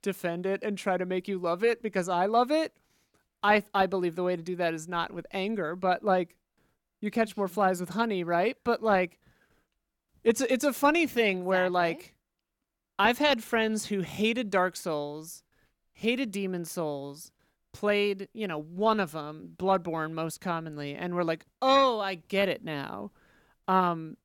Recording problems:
none

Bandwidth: 17 kHz